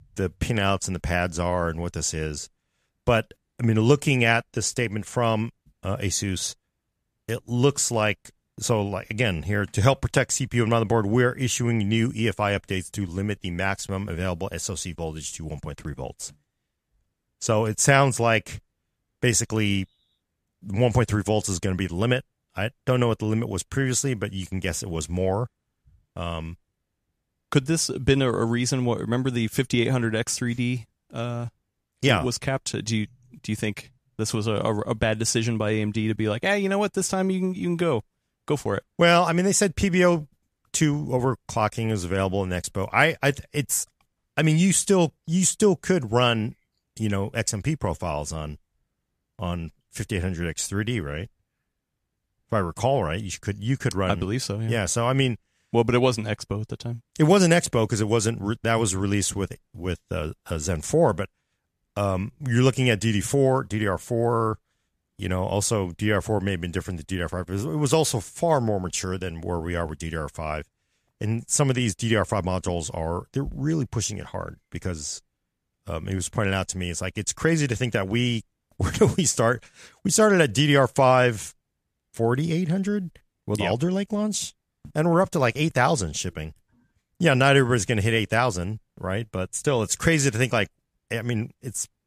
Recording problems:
none

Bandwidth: 14.5 kHz